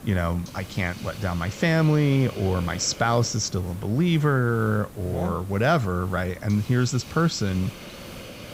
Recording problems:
high frequencies cut off; noticeable; nothing above 8 kHz
hiss; noticeable; throughout; 15 dB below the speech

